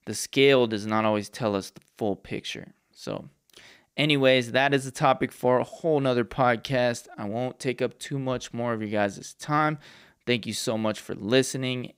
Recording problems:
none

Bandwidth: 15.5 kHz